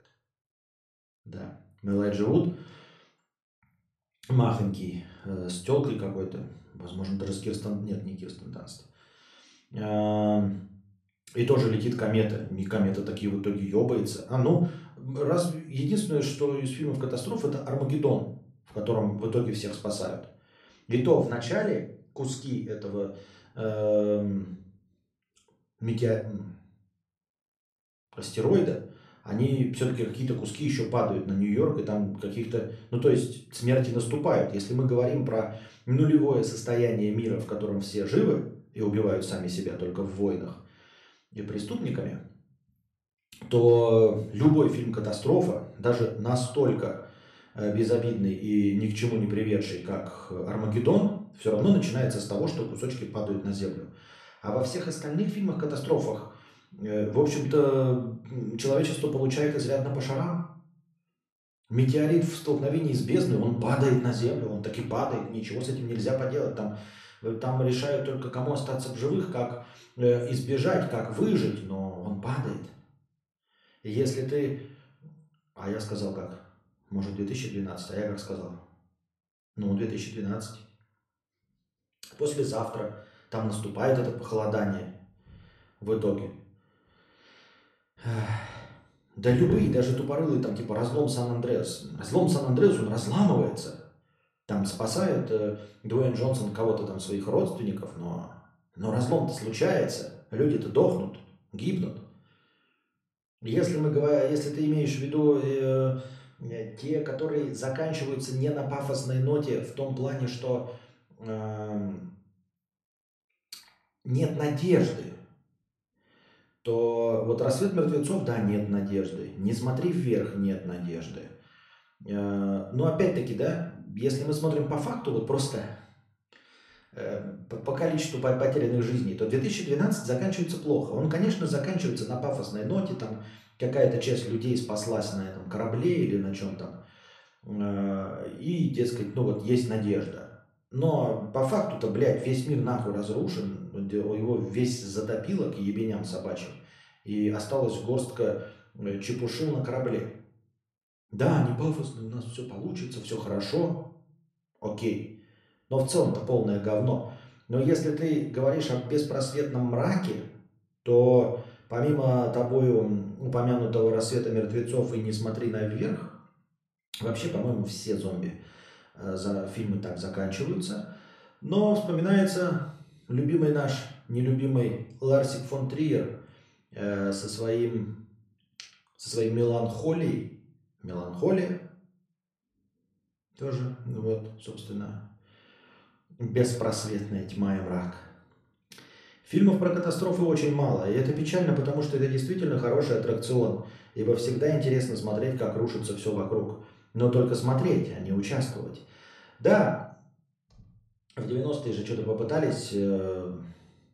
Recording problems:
echo of what is said; faint; from 46 s on; 130 ms later, 20 dB below the speech
room echo; slight; dies away in 0.4 s
off-mic speech; somewhat distant

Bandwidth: 13.5 kHz